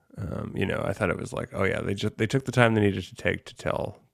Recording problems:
none

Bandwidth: 14.5 kHz